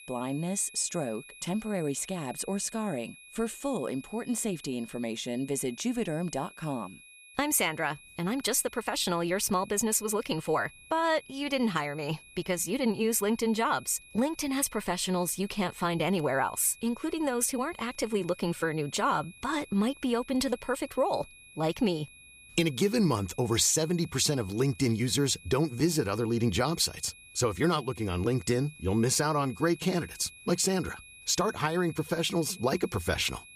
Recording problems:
high-pitched whine; faint; throughout; 2.5 kHz, 20 dB below the speech

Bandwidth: 14.5 kHz